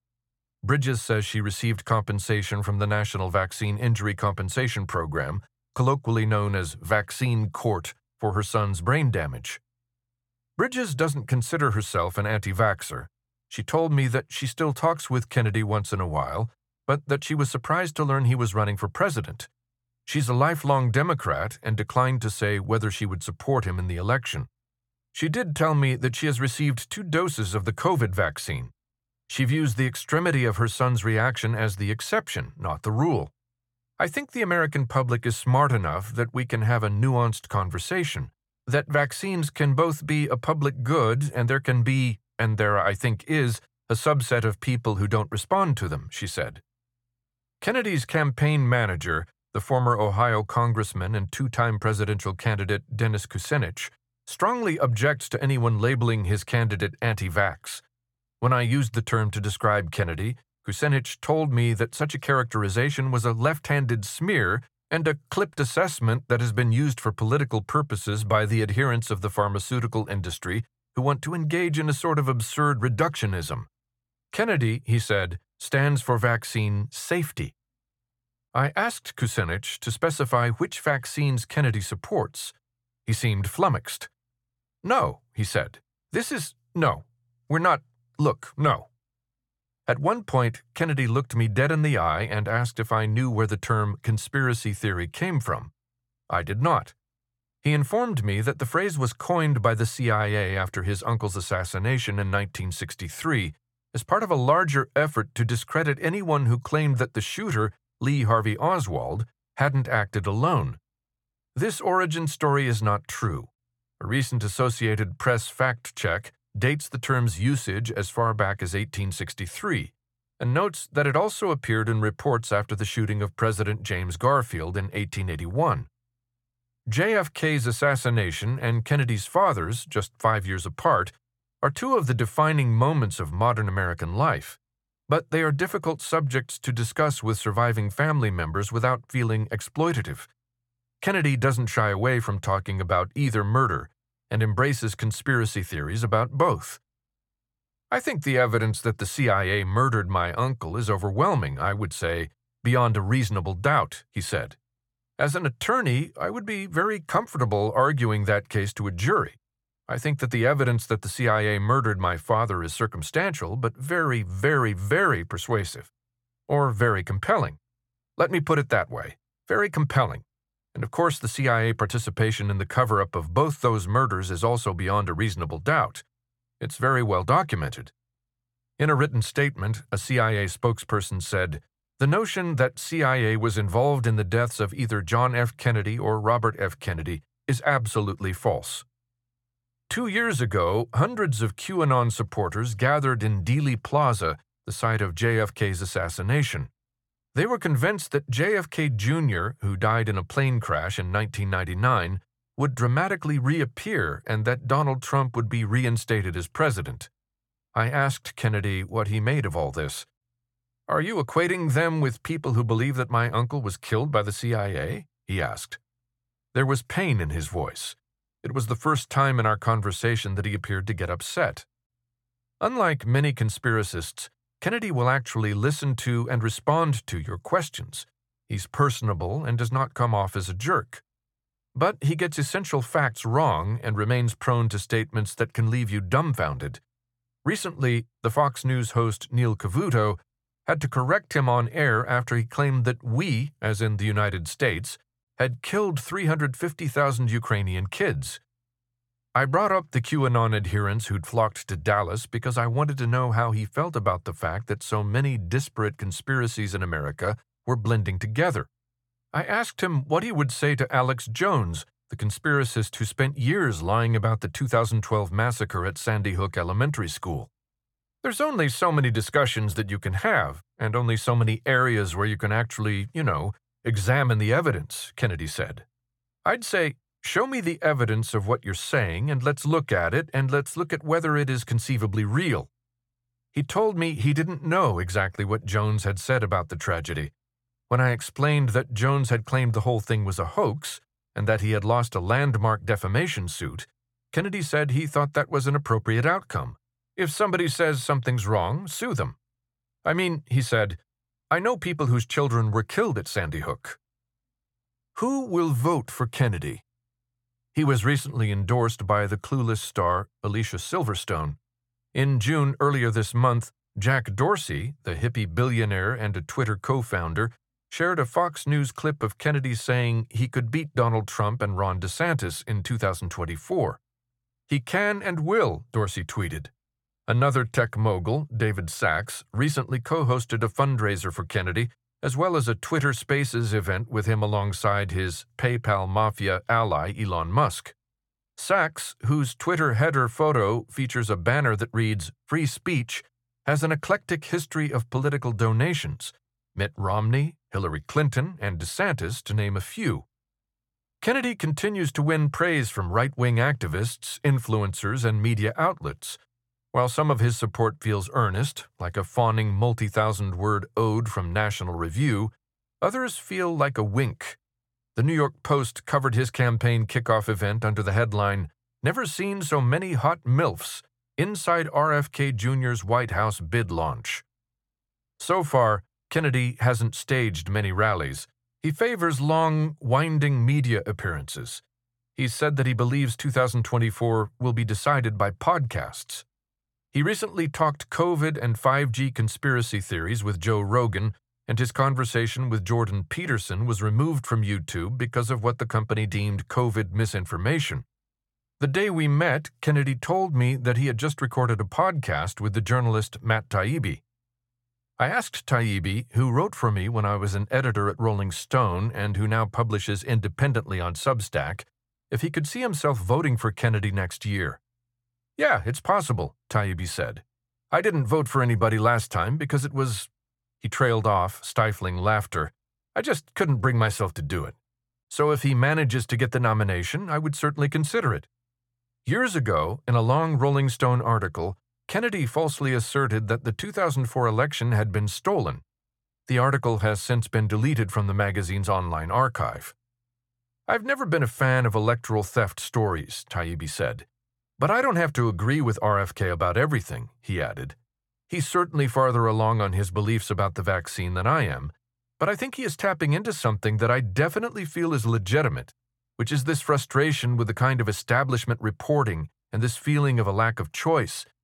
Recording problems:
none

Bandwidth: 17 kHz